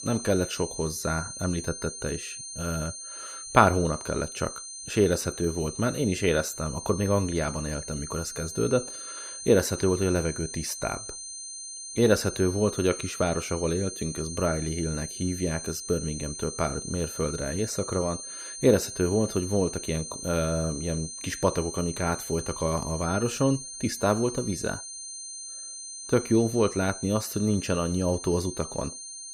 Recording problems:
high-pitched whine; loud; throughout; 6.5 kHz, 8 dB below the speech

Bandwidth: 15 kHz